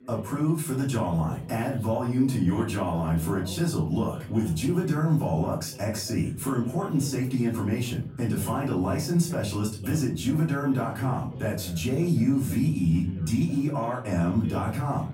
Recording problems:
off-mic speech; far
room echo; slight; dies away in 0.5 s
background chatter; faint; throughout; 4 voices, 20 dB below the speech

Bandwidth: 16 kHz